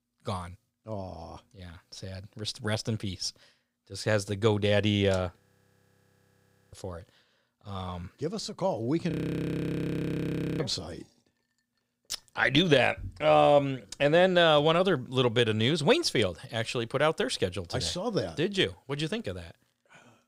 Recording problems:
audio freezing; at 5.5 s for 1.5 s and at 9 s for 1.5 s

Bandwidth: 15.5 kHz